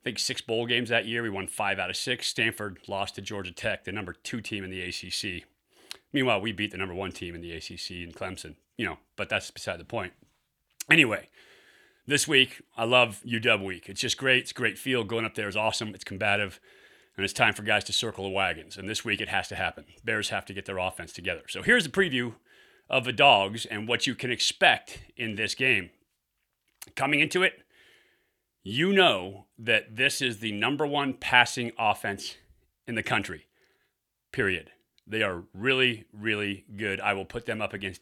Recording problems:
none

